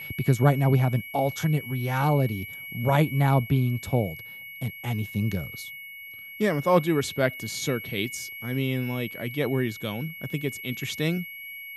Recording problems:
high-pitched whine; noticeable; throughout; 2 kHz, 10 dB below the speech

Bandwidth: 15 kHz